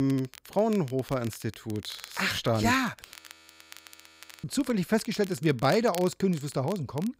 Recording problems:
crackle, like an old record; noticeable; 20 dB below the speech
abrupt cut into speech; at the start
audio freezing; at 3 s for 1.5 s

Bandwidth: 15.5 kHz